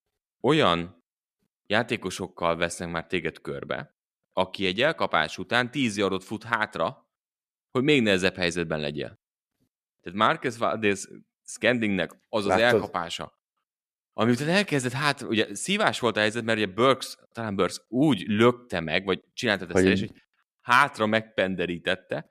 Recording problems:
none

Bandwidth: 14.5 kHz